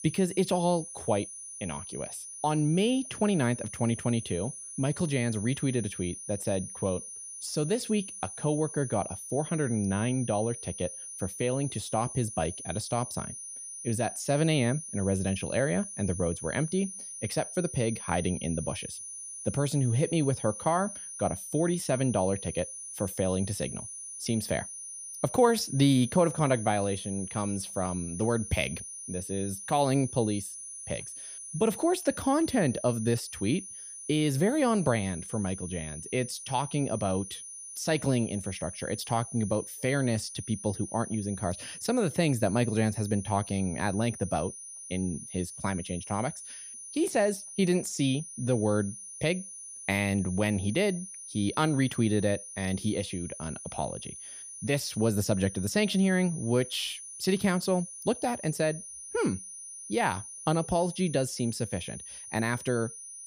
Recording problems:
high-pitched whine; loud; throughout; 9.5 kHz, 10 dB below the speech

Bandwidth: 15 kHz